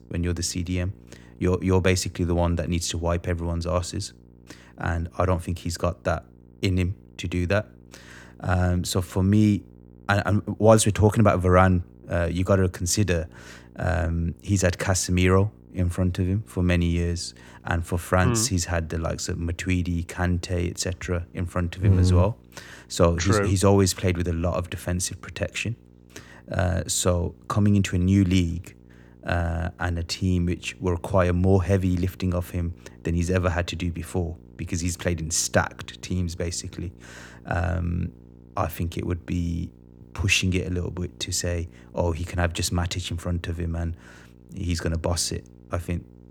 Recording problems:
electrical hum; faint; throughout; 60 Hz, 30 dB below the speech

